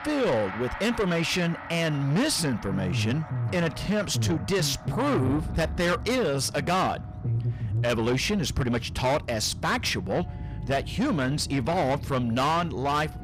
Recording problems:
distortion; heavy; 7 dB below the speech
background music; noticeable; throughout; 15 dB below the speech
low rumble; noticeable; throughout; 15 dB below the speech

